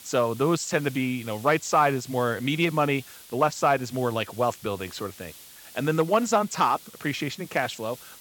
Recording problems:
high frequencies cut off; noticeable; nothing above 8 kHz
hiss; noticeable; throughout; 20 dB below the speech

